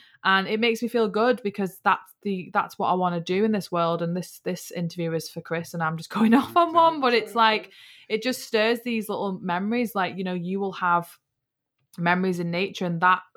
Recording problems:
none

